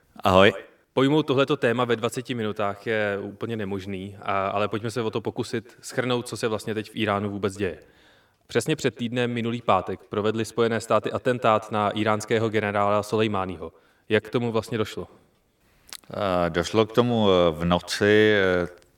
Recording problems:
echo of what is said; faint; throughout; 120 ms later, 20 dB below the speech

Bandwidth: 17 kHz